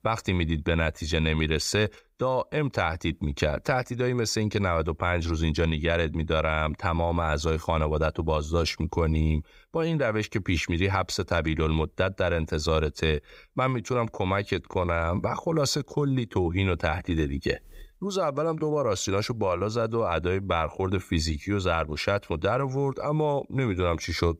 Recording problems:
none

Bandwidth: 15.5 kHz